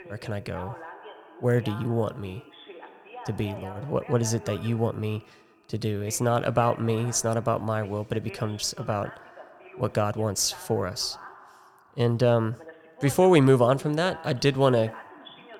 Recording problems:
voice in the background; noticeable; throughout; 20 dB below the speech

